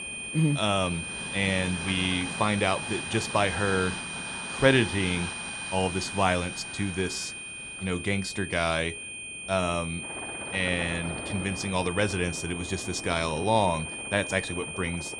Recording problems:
high-pitched whine; loud; throughout; 2.5 kHz, 7 dB below the speech
train or aircraft noise; noticeable; throughout; 10 dB below the speech

